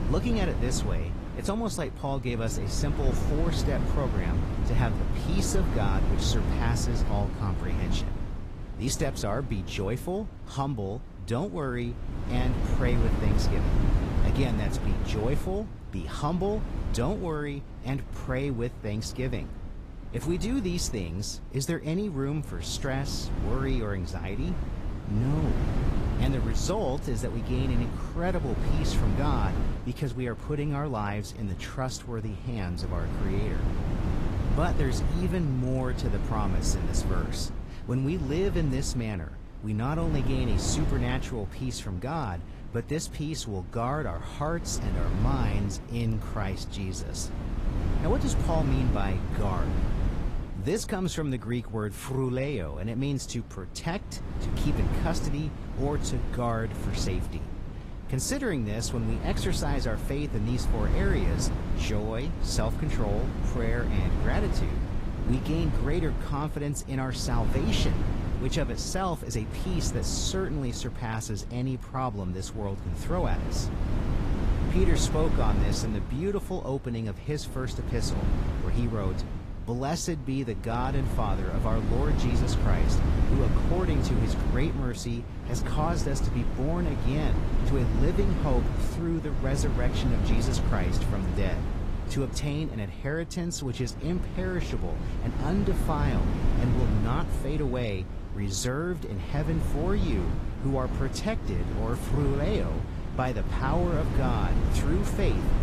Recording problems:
garbled, watery; slightly; nothing above 14.5 kHz
wind noise on the microphone; heavy; 5 dB below the speech

